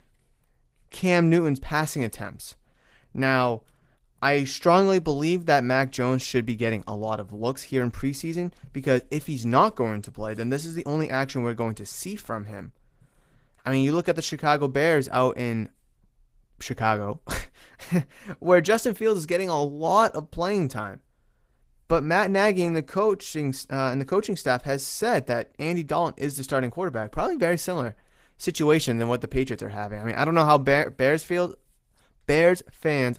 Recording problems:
garbled, watery; slightly; nothing above 15.5 kHz

